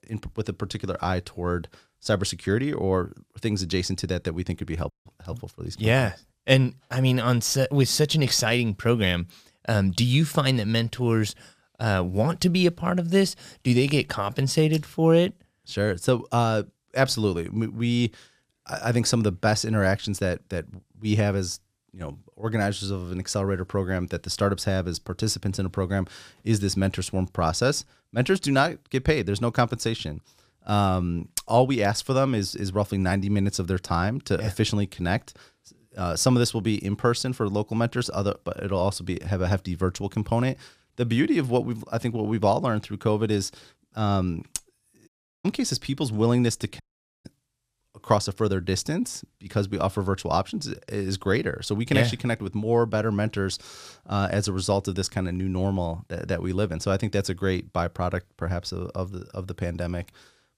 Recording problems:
audio cutting out; at 5 s, at 45 s and at 47 s

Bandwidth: 15 kHz